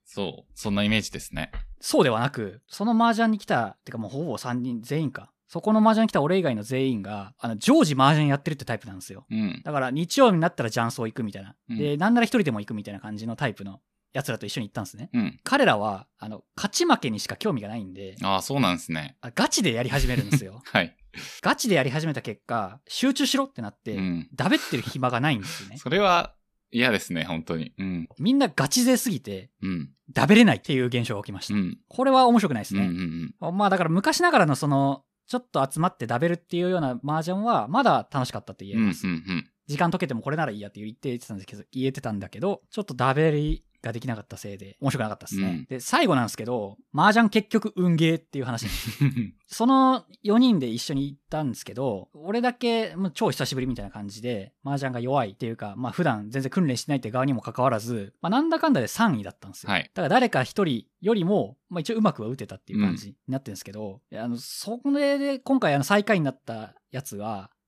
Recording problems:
none

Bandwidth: 14.5 kHz